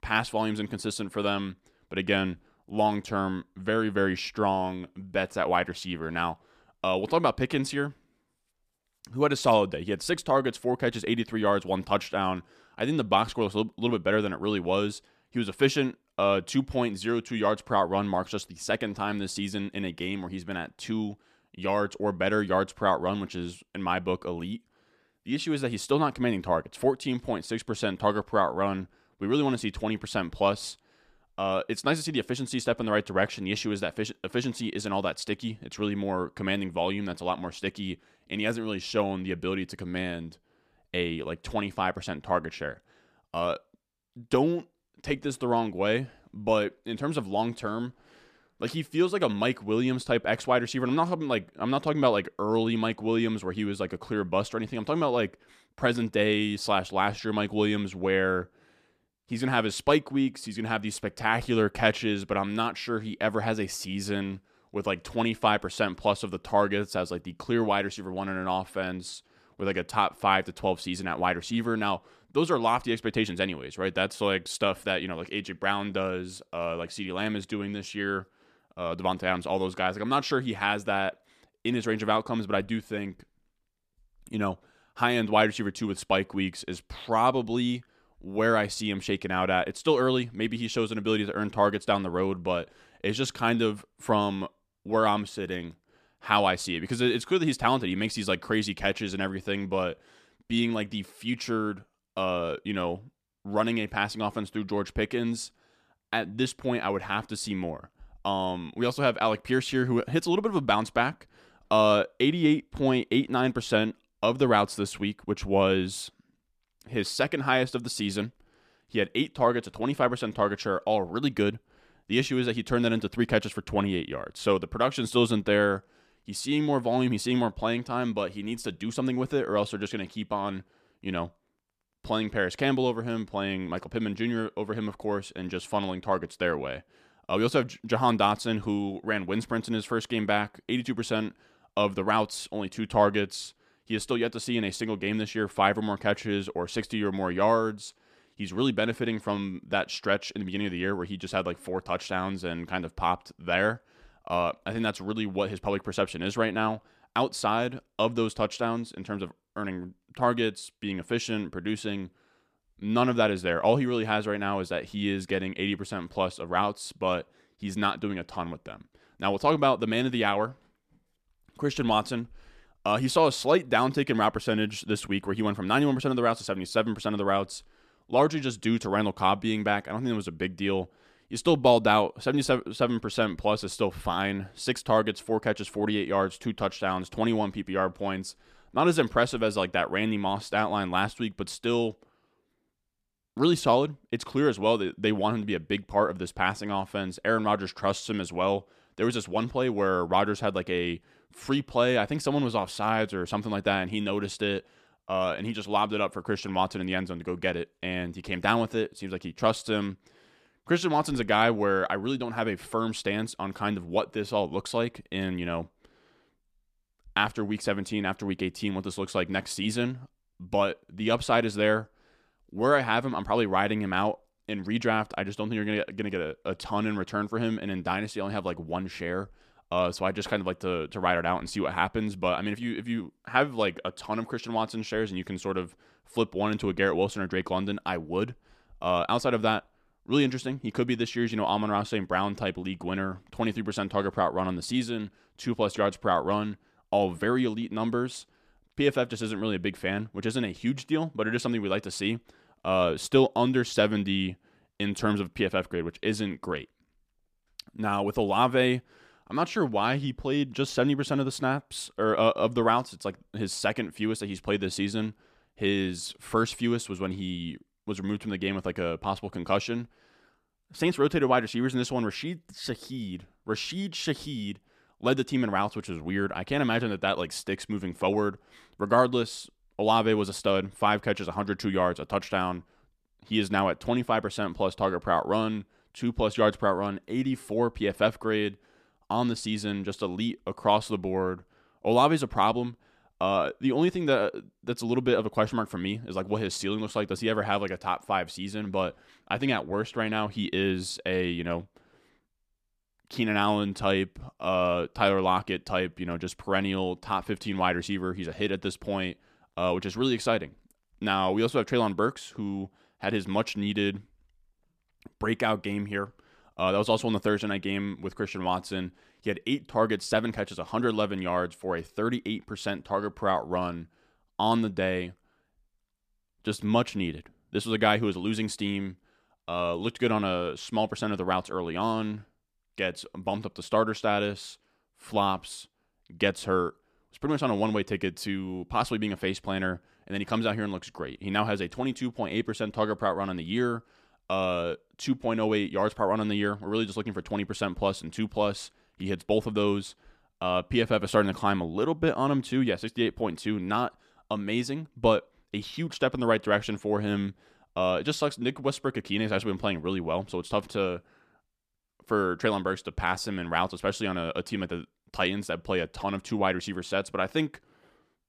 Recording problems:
none

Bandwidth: 14.5 kHz